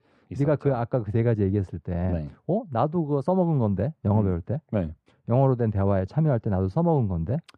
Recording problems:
muffled; very; fading above 2 kHz

